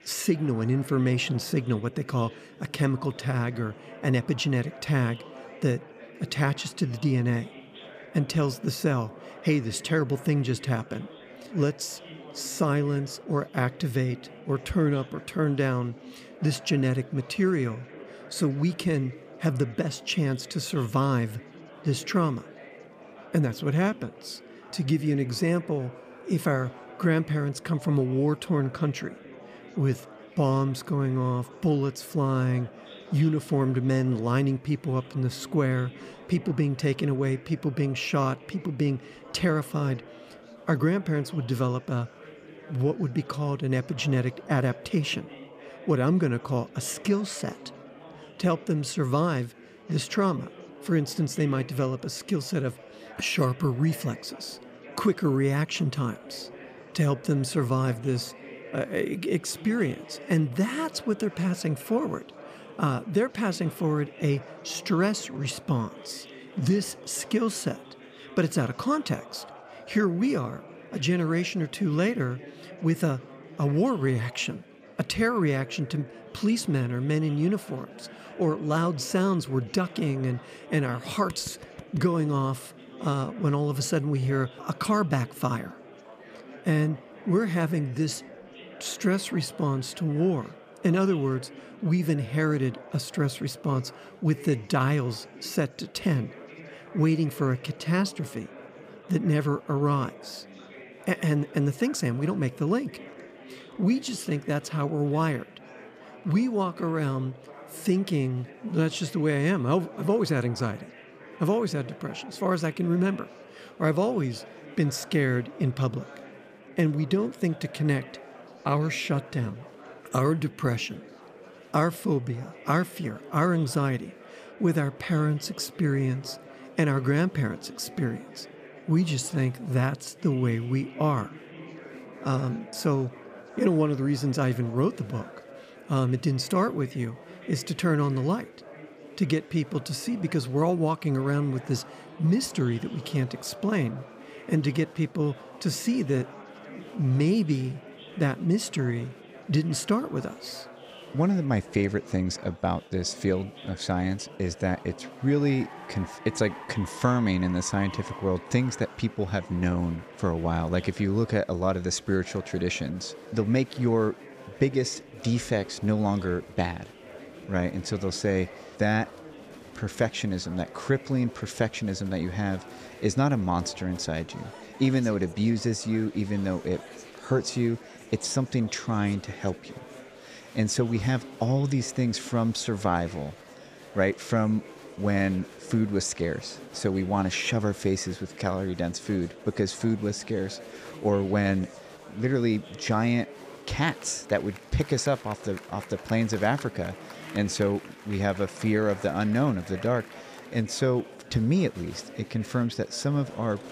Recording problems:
murmuring crowd; noticeable; throughout; 20 dB below the speech

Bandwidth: 15 kHz